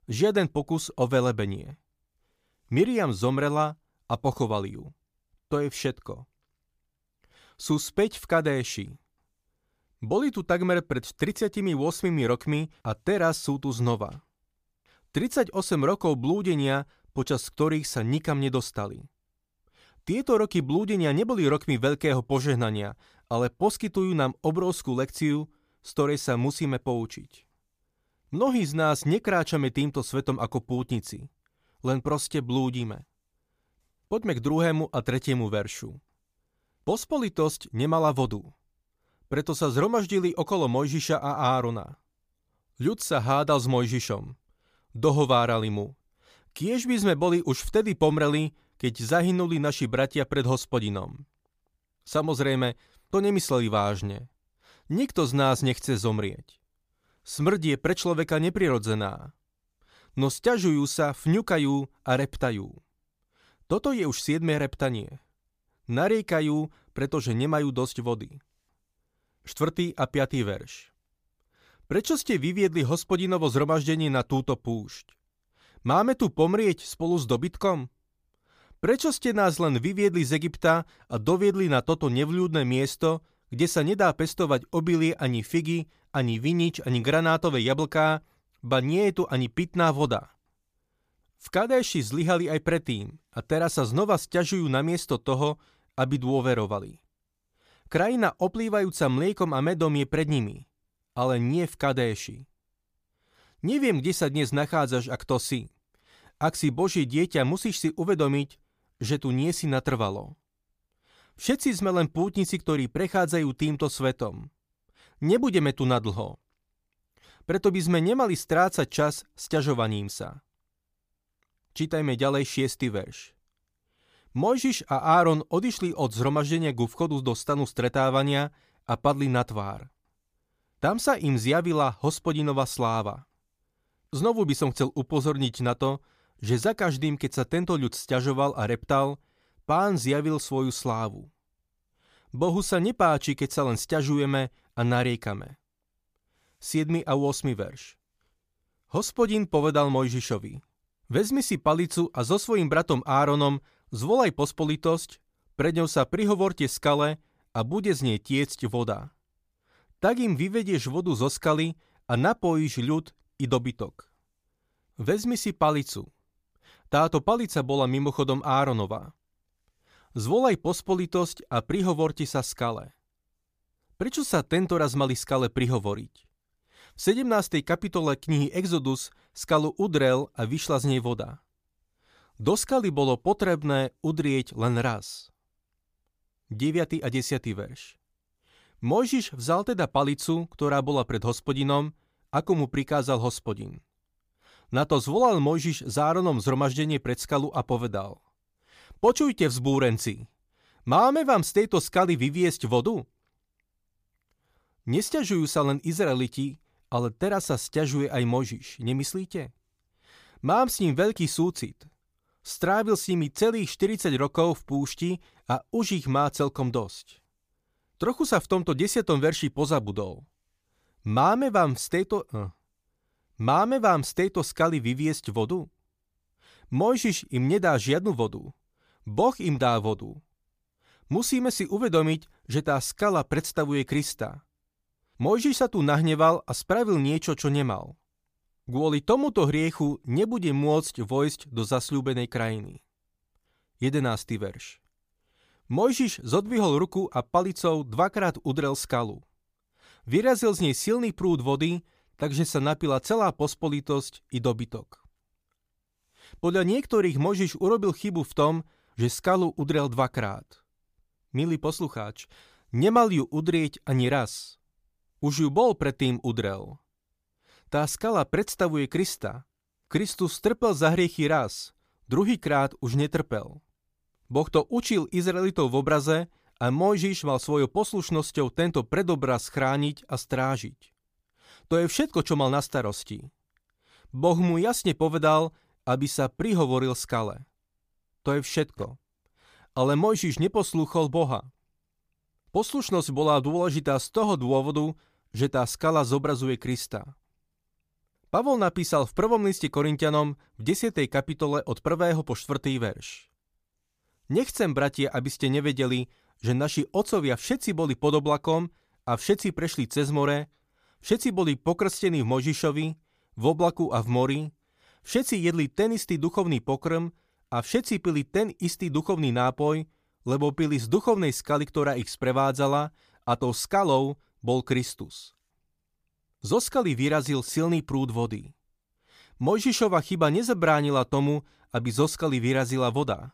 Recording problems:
none

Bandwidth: 15 kHz